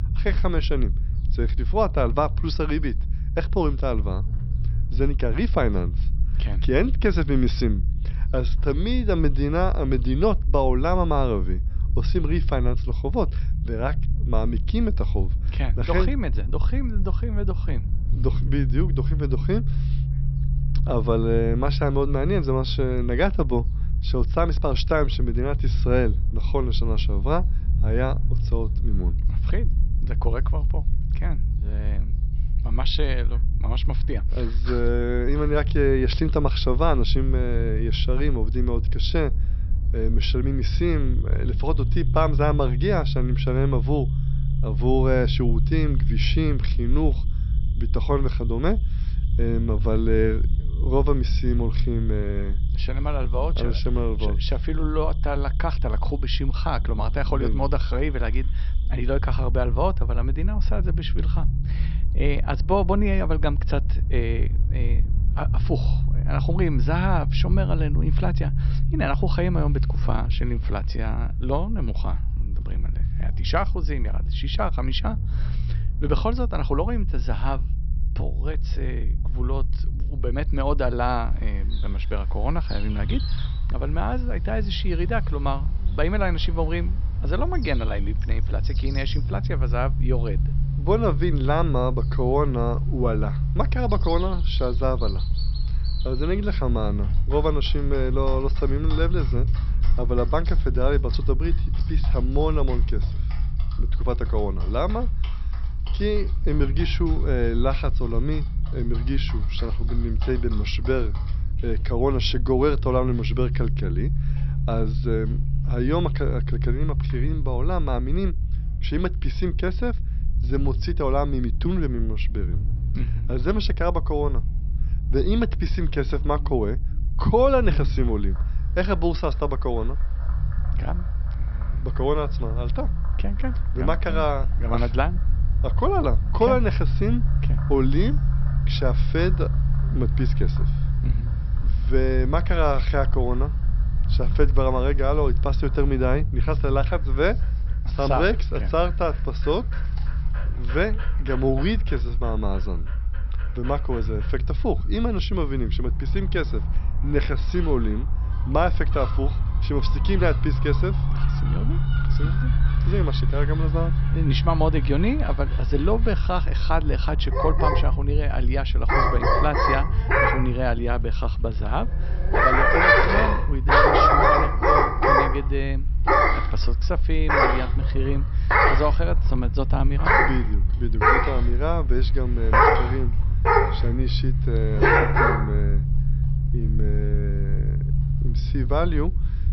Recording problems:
high frequencies cut off; noticeable; nothing above 5.5 kHz
animal sounds; very loud; throughout; 5 dB above the speech
low rumble; noticeable; throughout; 15 dB below the speech

